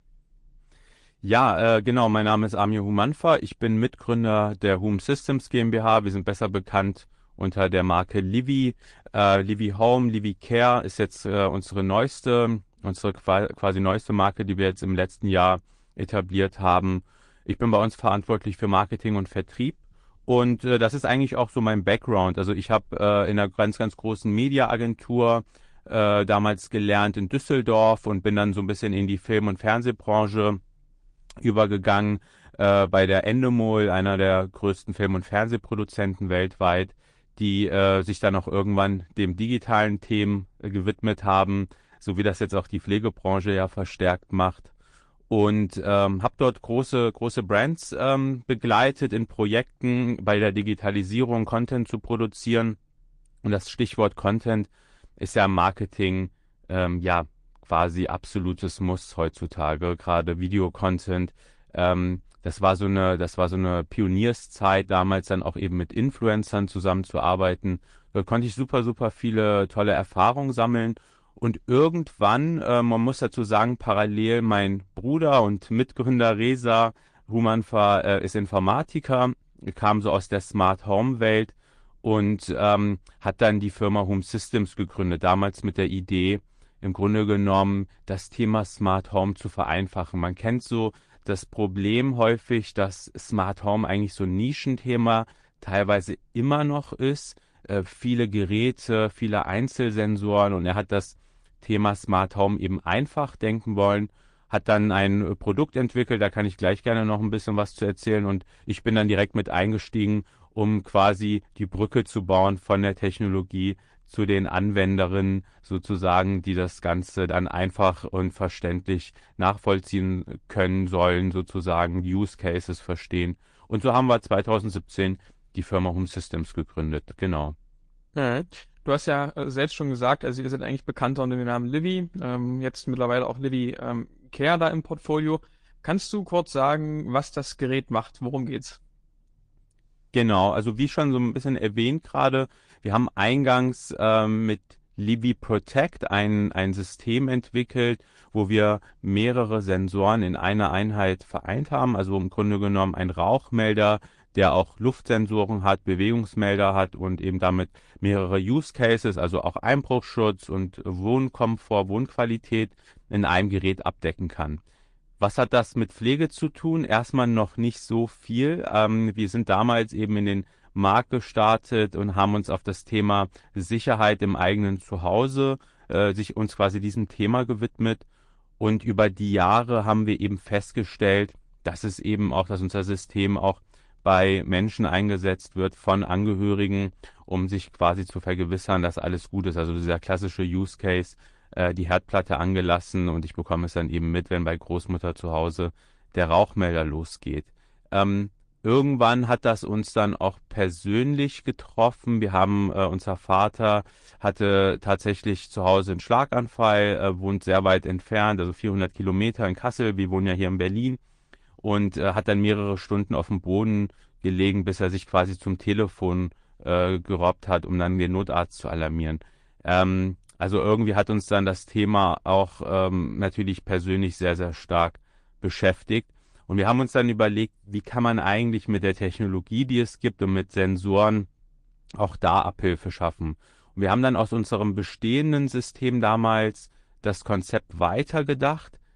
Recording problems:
garbled, watery; slightly; nothing above 10 kHz

